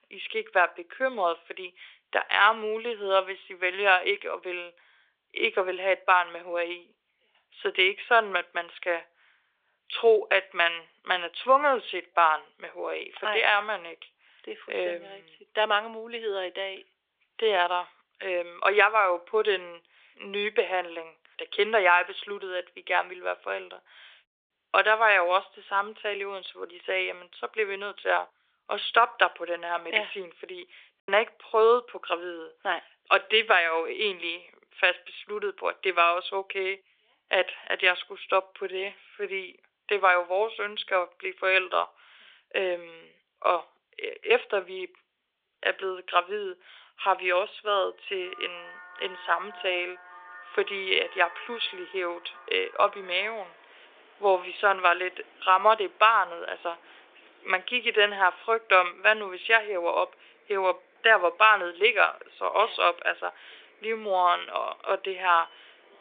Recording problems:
thin; very; fading below 350 Hz
phone-call audio
traffic noise; faint; from 48 s on; 25 dB below the speech
choppy; occasionally; at 31 s; 1% of the speech affected

